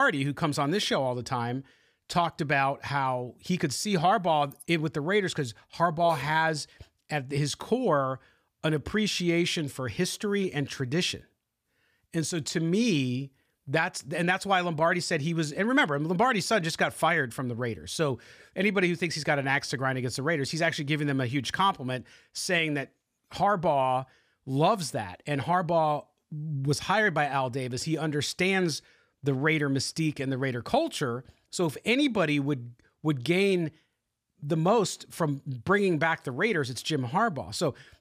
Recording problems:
abrupt cut into speech; at the start

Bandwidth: 15 kHz